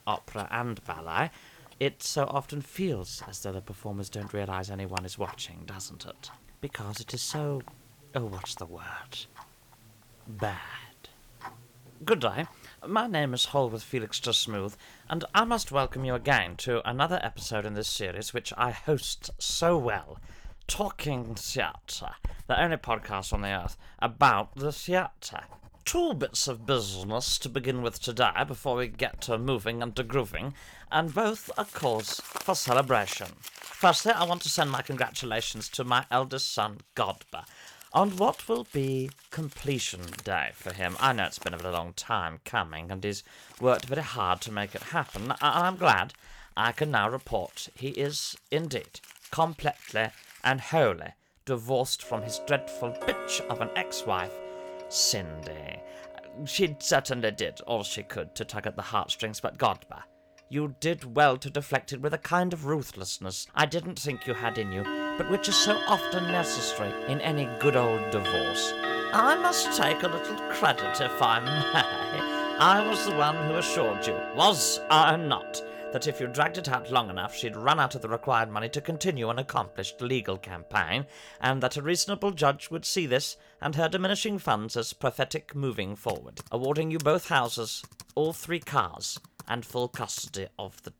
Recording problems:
household noises; loud; throughout; 7 dB below the speech

